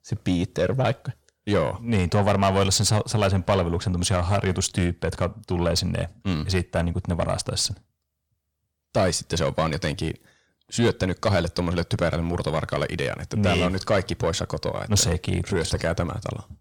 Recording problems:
distortion; slight; 10 dB below the speech

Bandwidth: 17 kHz